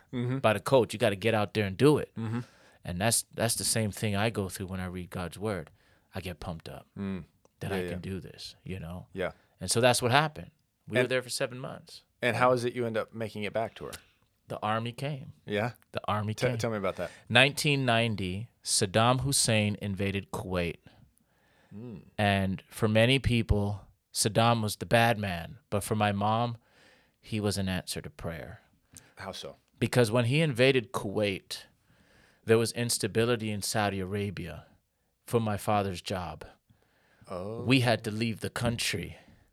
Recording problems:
none

